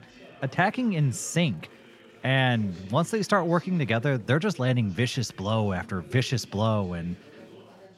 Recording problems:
chatter from many people; faint; throughout; 25 dB below the speech

